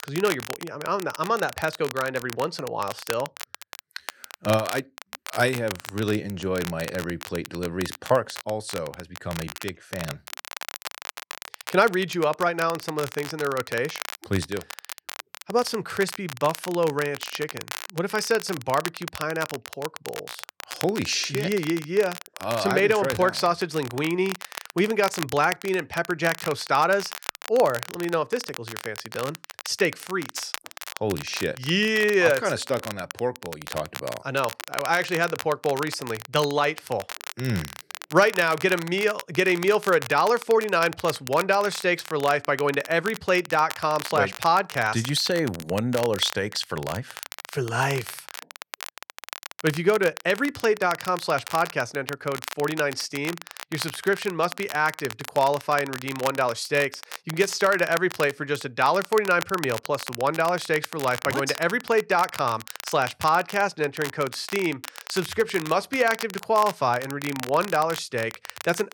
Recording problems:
crackle, like an old record; noticeable; 10 dB below the speech

